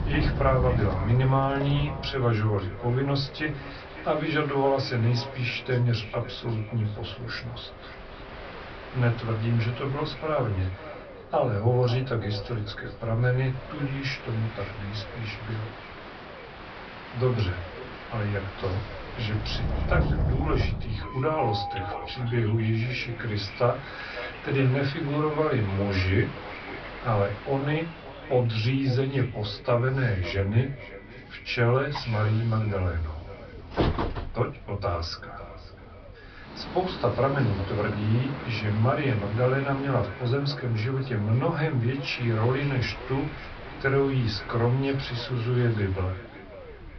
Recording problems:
off-mic speech; far
echo of what is said; noticeable; throughout; 550 ms later, 20 dB below the speech
high frequencies cut off; noticeable; nothing above 5.5 kHz
room echo; very slight; dies away in 0.2 s
train or aircraft noise; noticeable; throughout; 10 dB below the speech
low rumble; faint; throughout; 25 dB below the speech

